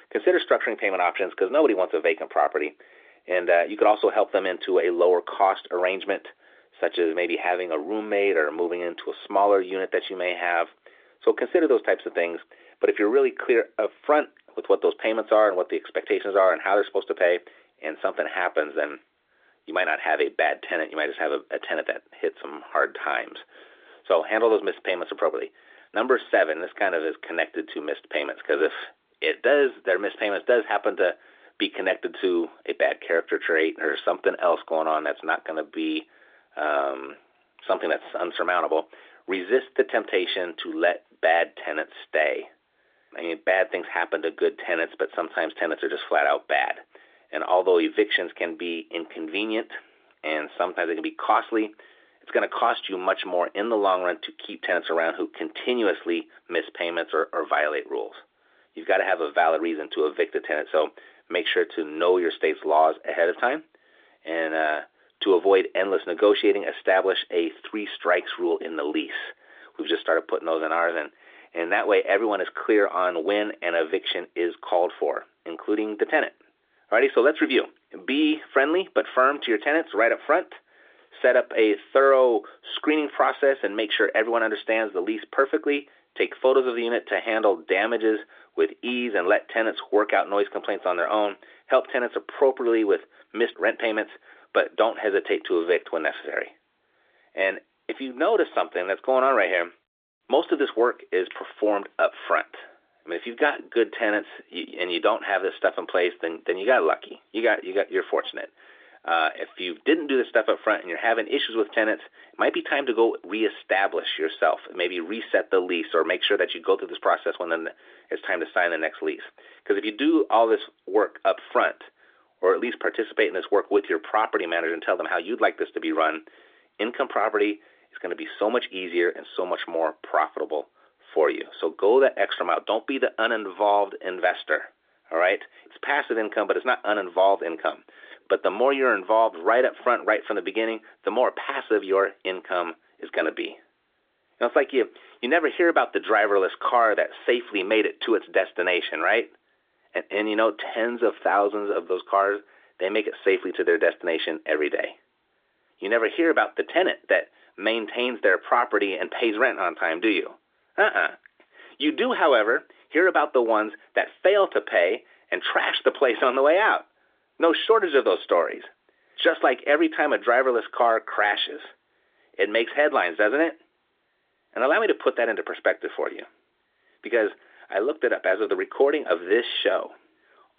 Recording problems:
phone-call audio

